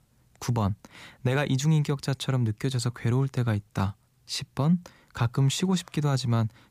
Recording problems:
none

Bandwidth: 15 kHz